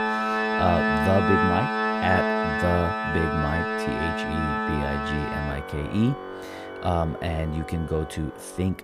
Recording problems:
background music; very loud; throughout; 2 dB above the speech

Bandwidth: 15.5 kHz